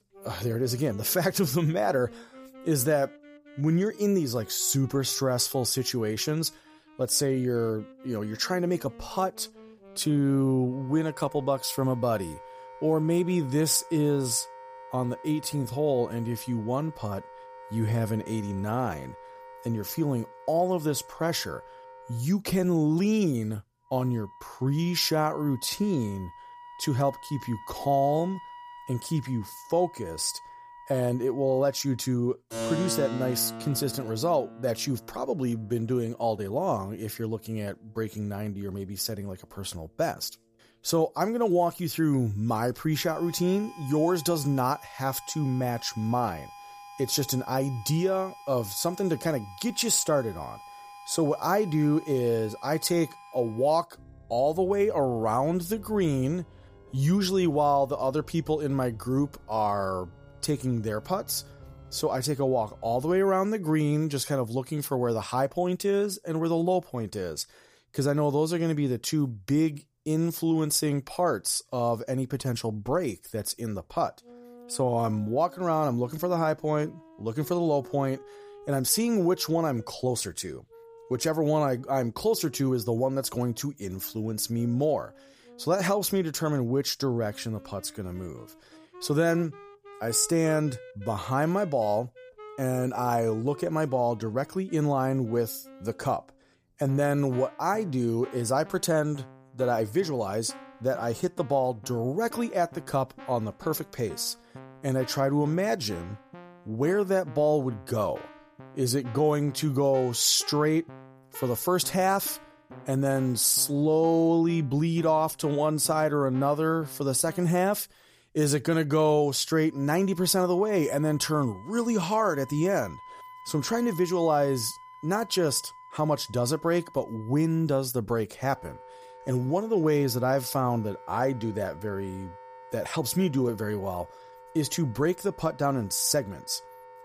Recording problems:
background music; noticeable; throughout; 20 dB below the speech

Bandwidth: 15 kHz